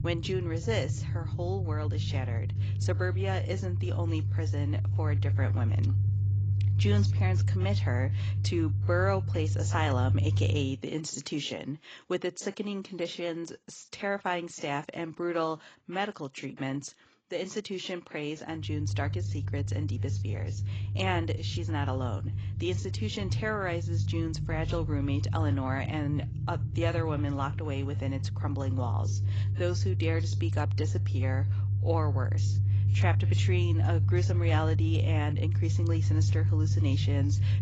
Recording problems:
garbled, watery; badly; nothing above 7.5 kHz
low rumble; loud; until 11 s and from 19 s on; 9 dB below the speech

